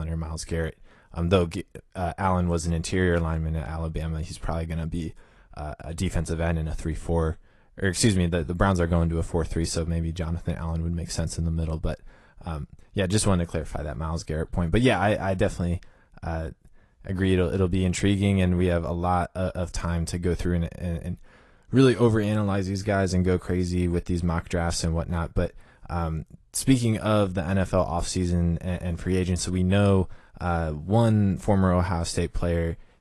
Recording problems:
garbled, watery; slightly; nothing above 11 kHz
abrupt cut into speech; at the start

